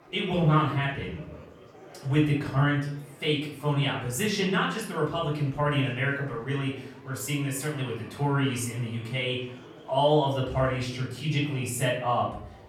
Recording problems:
off-mic speech; far
room echo; noticeable; dies away in 0.6 s
chatter from many people; faint; throughout; 20 dB below the speech

